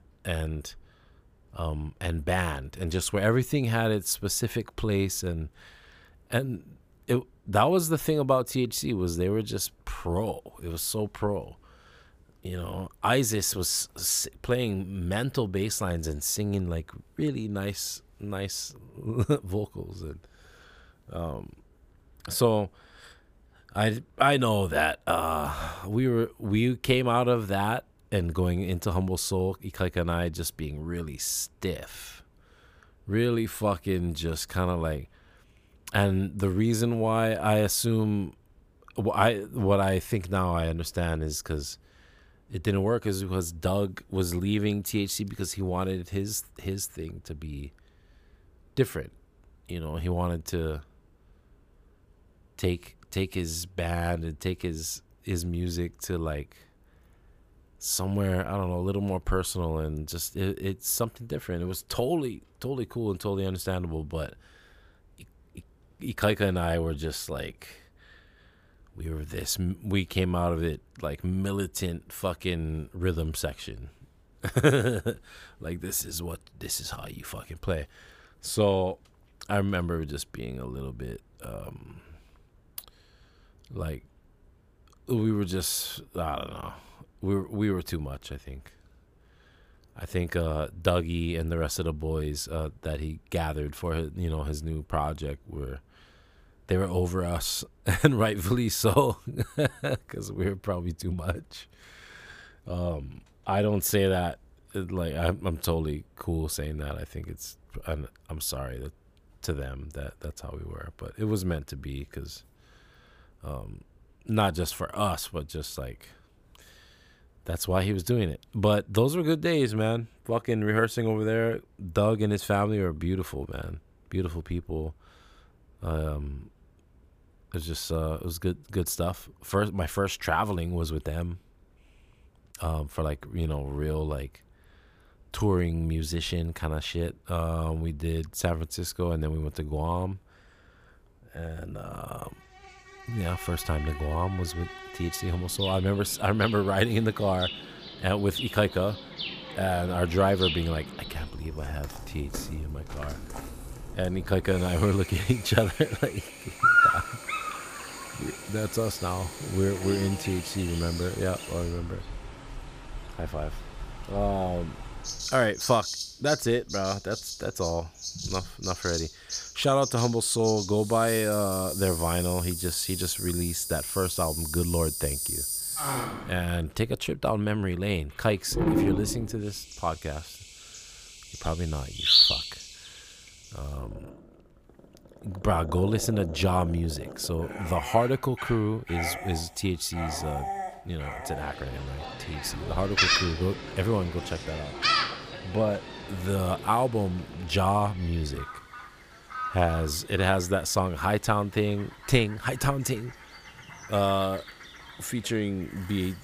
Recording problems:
animal sounds; loud; from 2:23 on; 3 dB below the speech

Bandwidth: 15 kHz